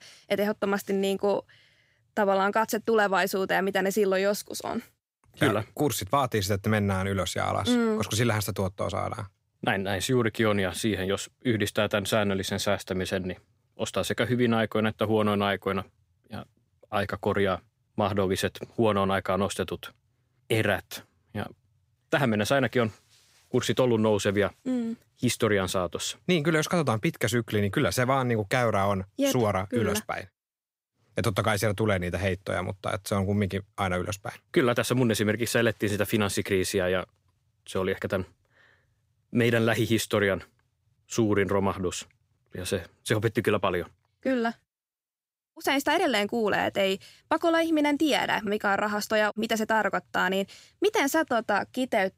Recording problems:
none

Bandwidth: 15.5 kHz